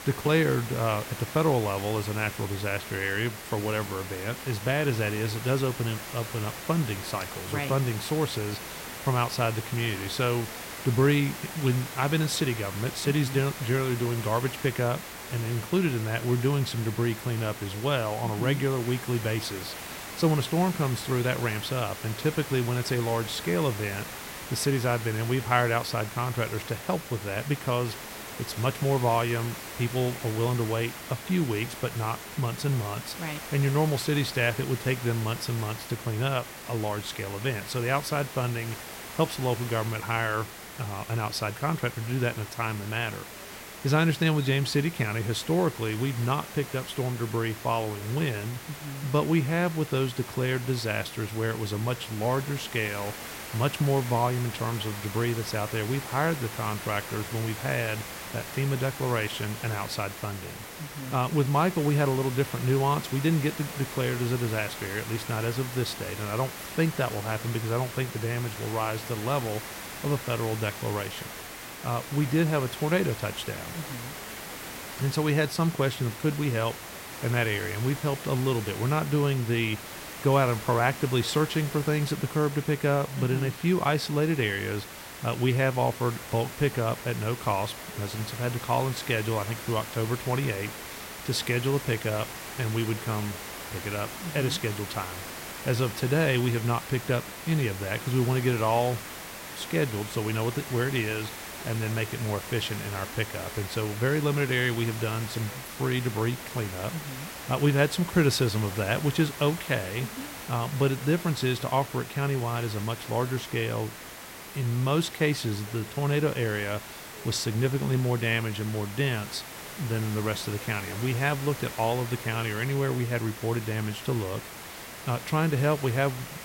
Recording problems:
hiss; loud; throughout; 10 dB below the speech
voice in the background; faint; throughout; 30 dB below the speech

